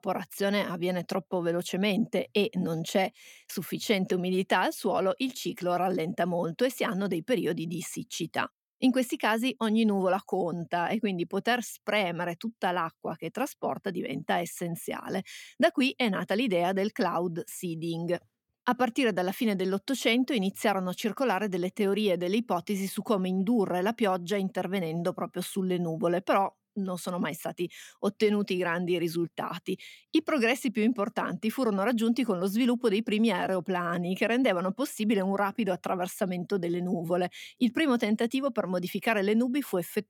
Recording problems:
none

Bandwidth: 17.5 kHz